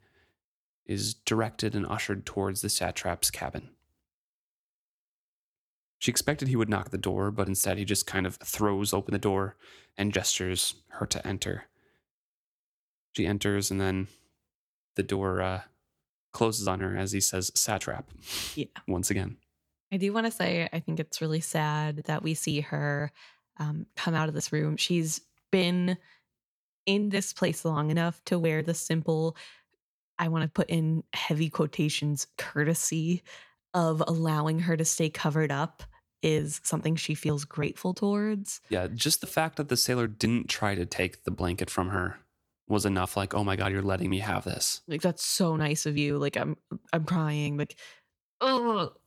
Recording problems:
none

